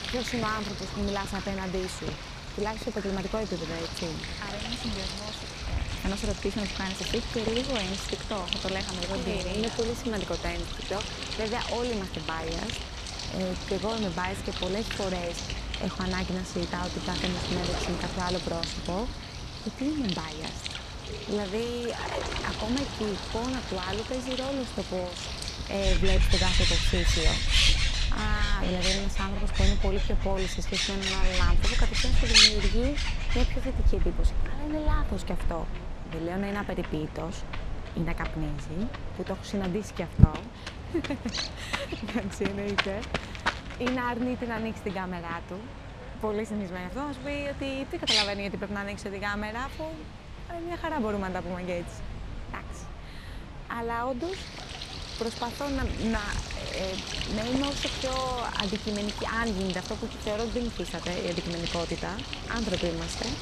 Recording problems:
animal sounds; very loud; throughout; 2 dB above the speech

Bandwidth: 15.5 kHz